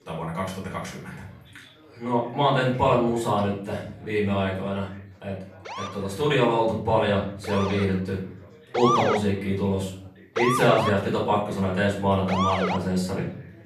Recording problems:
off-mic speech; far
room echo; noticeable; dies away in 0.5 s
chatter from many people; faint; throughout; 25 dB below the speech
siren; loud; from 5.5 to 13 s; peak 2 dB above the speech

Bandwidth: 13.5 kHz